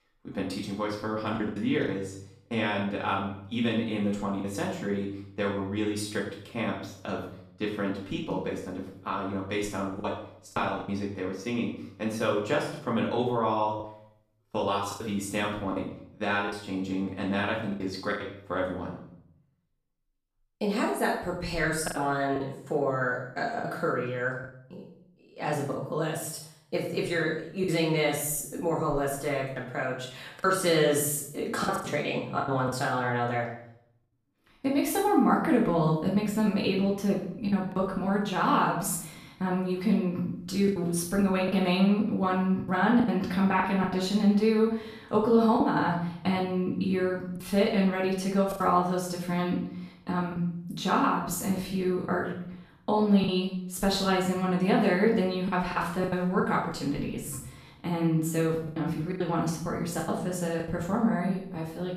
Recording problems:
off-mic speech; far
room echo; noticeable; dies away in 0.6 s
choppy; occasionally; 5% of the speech affected

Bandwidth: 14.5 kHz